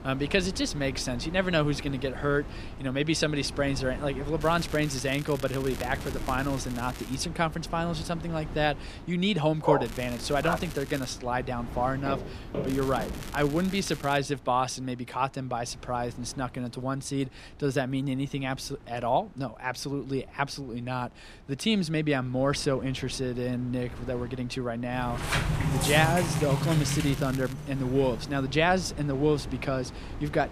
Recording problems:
wind noise on the microphone; occasional gusts; 15 dB below the speech
crackling; noticeable; 4 times, first at 4.5 s; 15 dB below the speech
dog barking; loud; at 9.5 s; peak level with the speech
footsteps; noticeable; from 12 to 13 s; peak 6 dB below the speech
door banging; loud; from 25 to 28 s; peak 2 dB above the speech

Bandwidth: 14.5 kHz